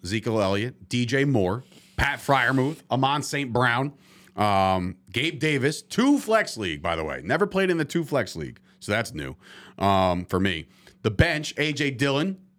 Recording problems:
none

